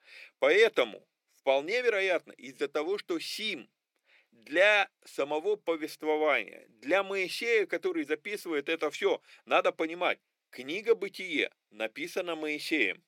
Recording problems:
thin; somewhat; fading below 300 Hz

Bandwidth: 17 kHz